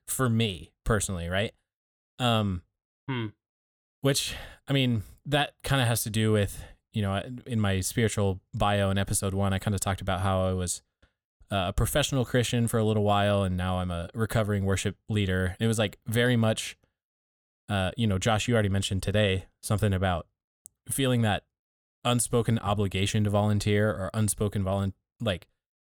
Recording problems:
none

